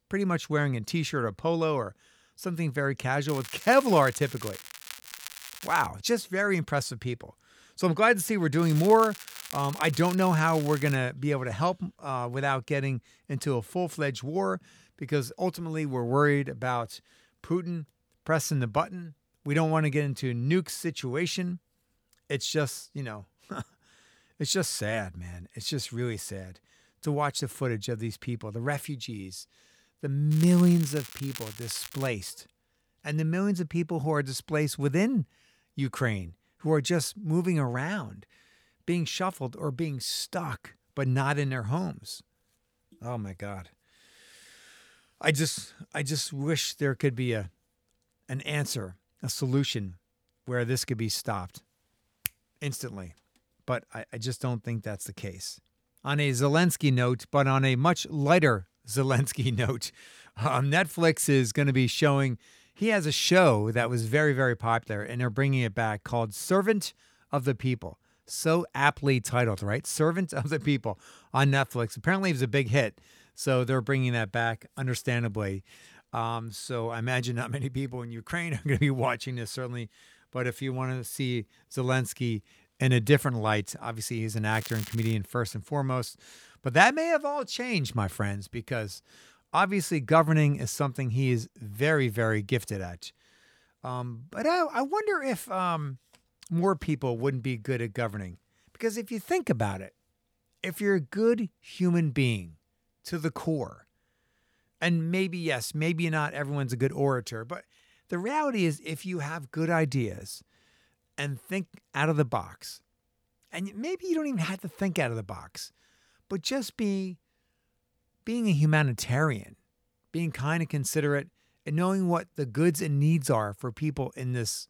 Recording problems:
crackling; noticeable; 4 times, first at 3.5 s; 15 dB below the speech

